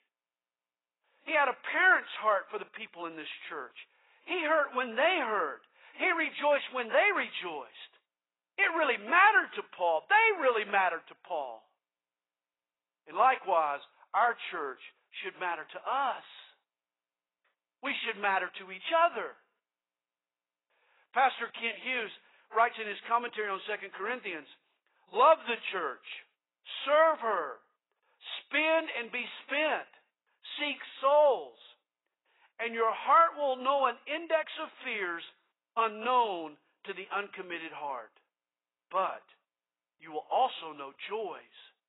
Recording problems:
garbled, watery; badly; nothing above 4 kHz
thin; very; fading below 450 Hz

